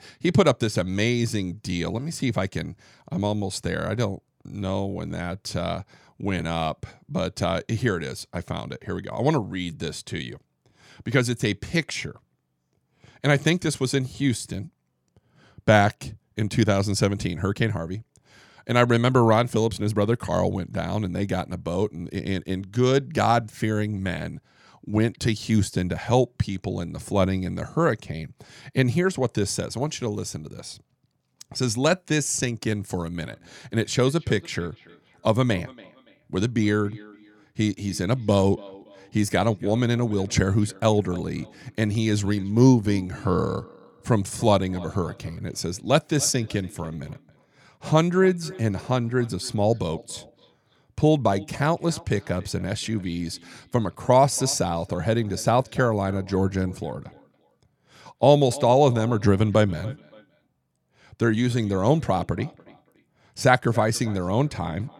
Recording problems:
echo of what is said; faint; from 33 s on; 280 ms later, 20 dB below the speech

